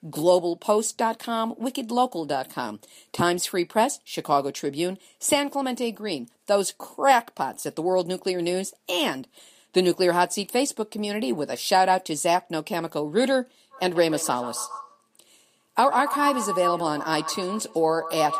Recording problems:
echo of what is said; strong; from 14 s on; 140 ms later, 7 dB below the speech

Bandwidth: 14.5 kHz